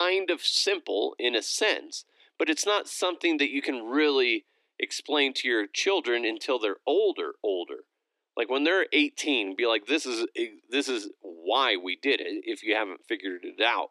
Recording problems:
thin; somewhat; fading below 300 Hz
abrupt cut into speech; at the start

